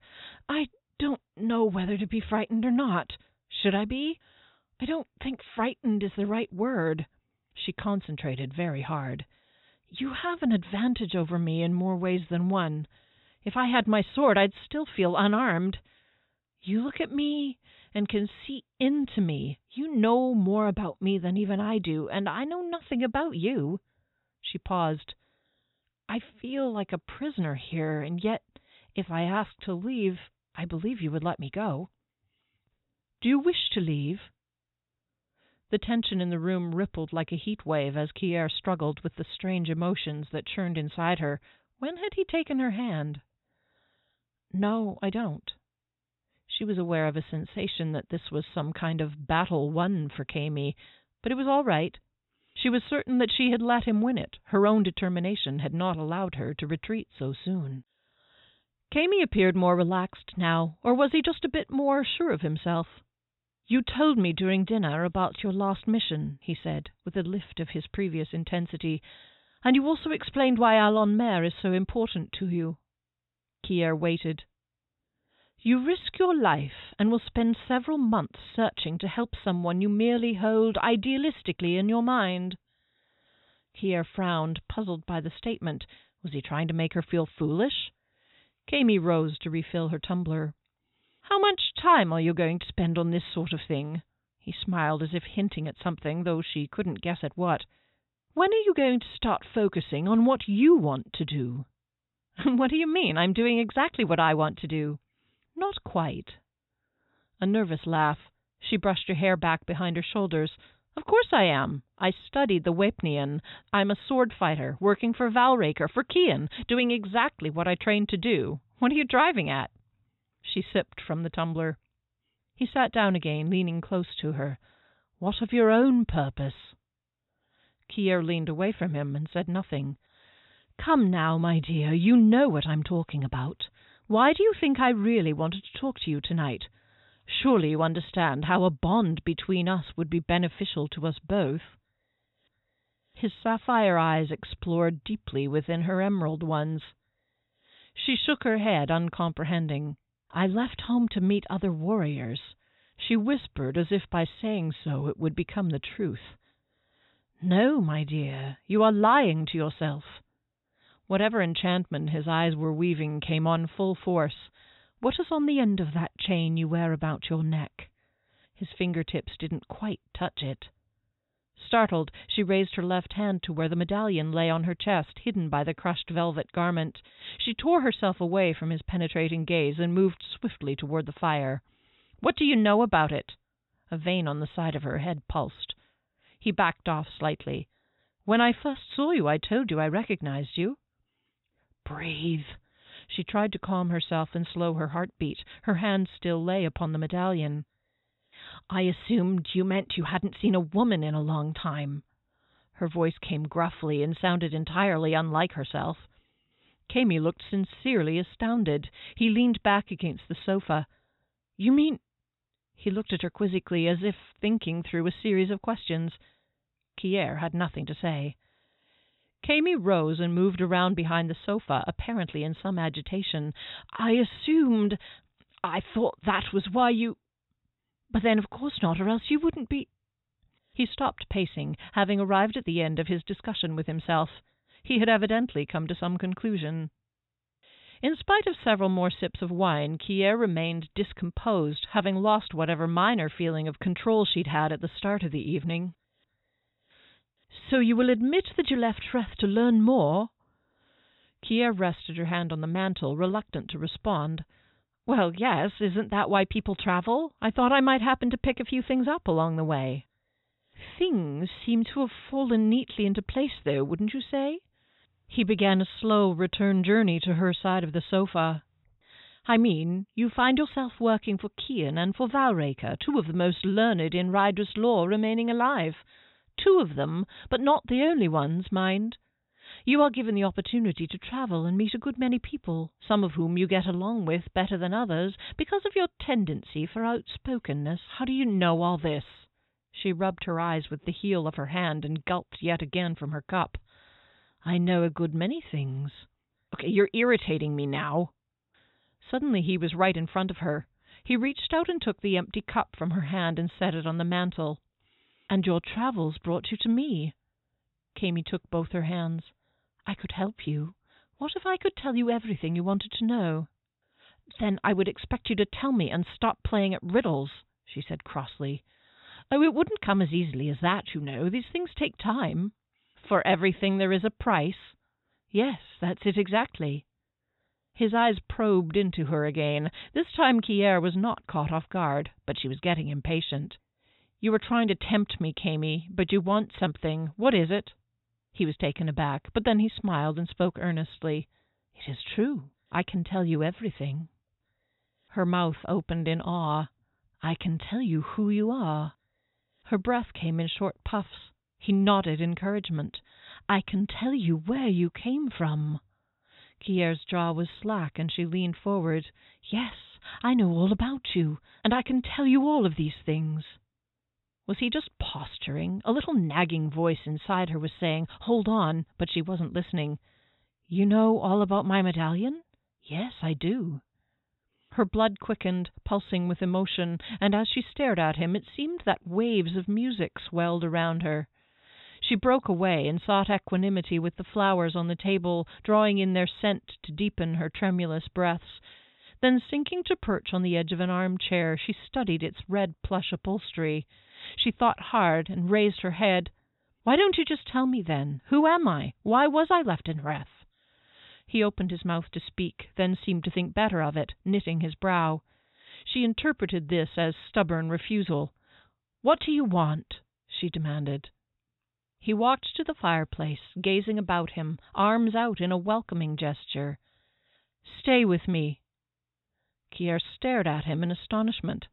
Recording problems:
high frequencies cut off; severe; nothing above 4 kHz

